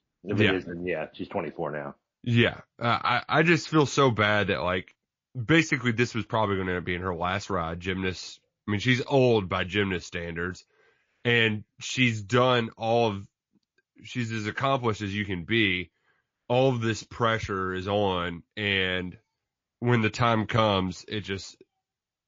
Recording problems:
garbled, watery; slightly

